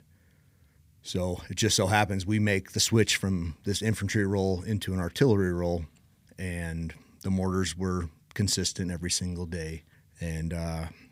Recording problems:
none

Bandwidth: 15.5 kHz